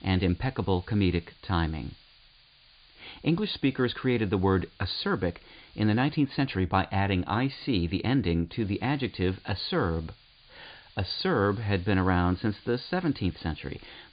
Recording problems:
high frequencies cut off; severe; nothing above 5 kHz
hiss; faint; until 6 s and from 8.5 s on; 25 dB below the speech

